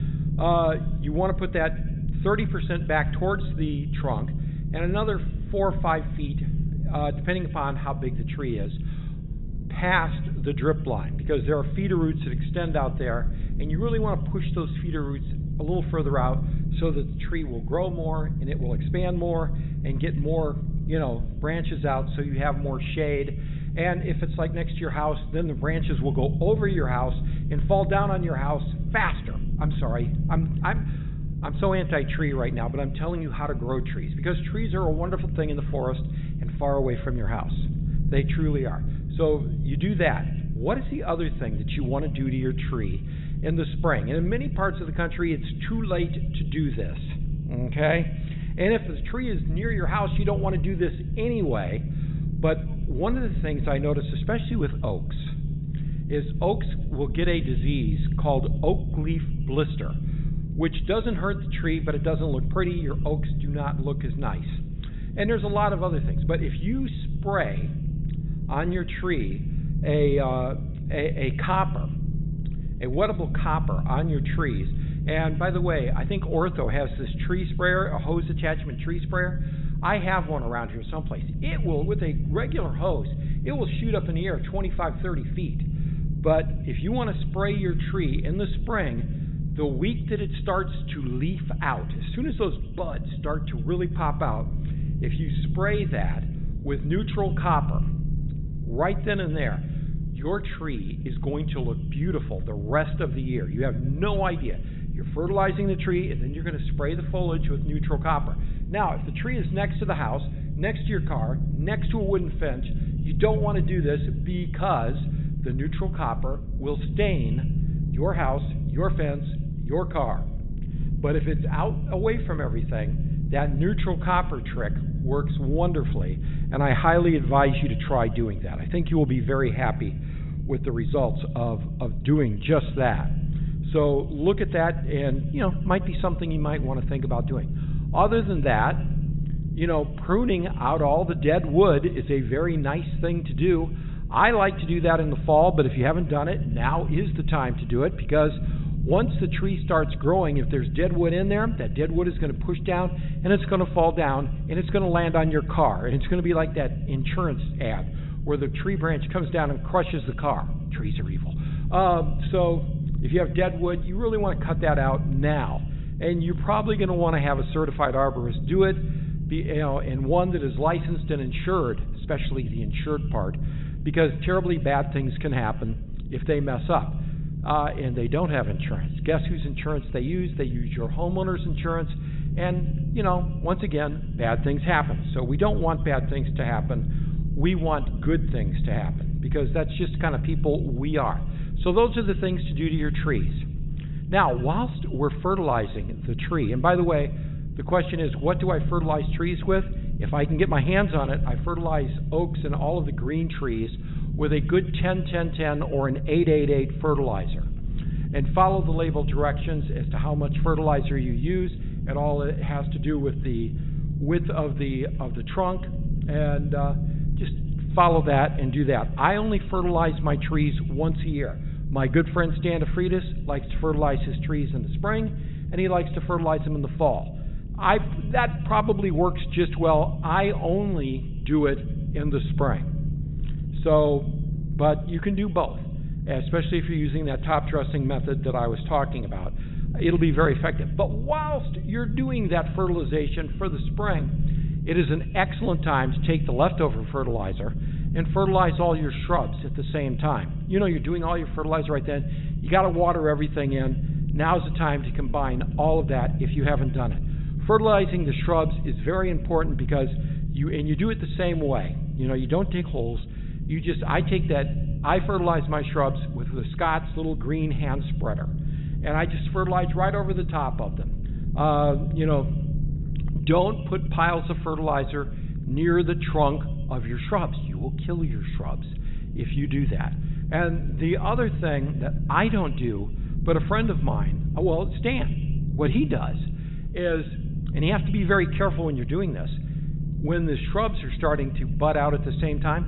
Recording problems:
high frequencies cut off; severe; nothing above 4 kHz
echo of what is said; faint; throughout; 100 ms later, 25 dB below the speech
low rumble; noticeable; throughout; 15 dB below the speech

